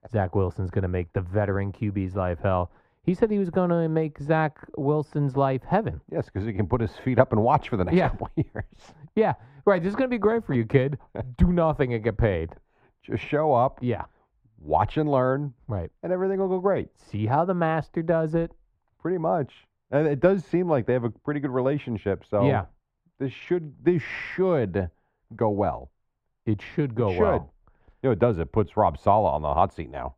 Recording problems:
muffled; very; fading above 3 kHz

